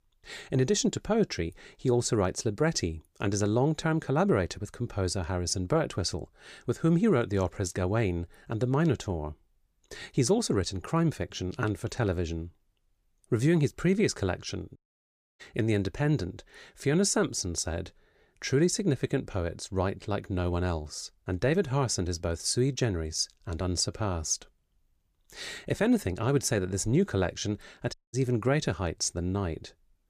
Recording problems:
audio cutting out; at 15 s for 0.5 s and at 28 s

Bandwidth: 15 kHz